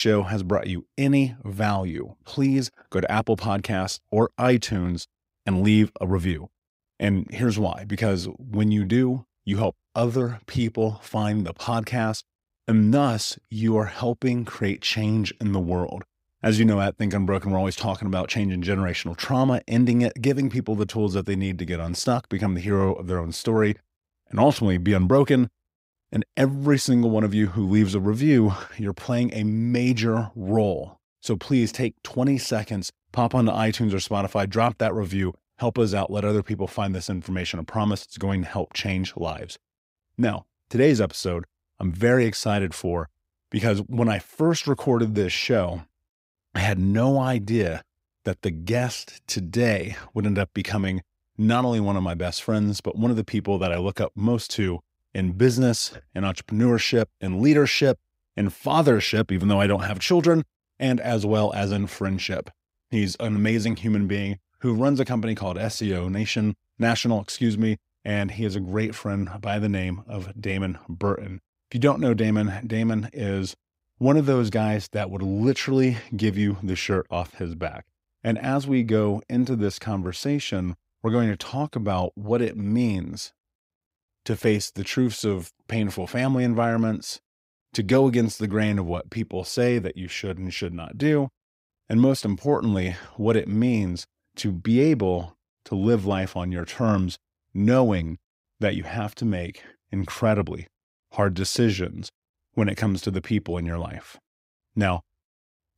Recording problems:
abrupt cut into speech; at the start

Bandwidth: 15.5 kHz